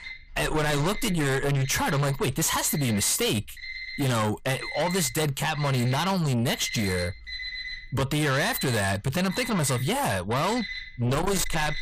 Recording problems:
distortion; heavy; 8 dB below the speech
alarms or sirens; noticeable; throughout; 10 dB below the speech

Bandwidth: 15 kHz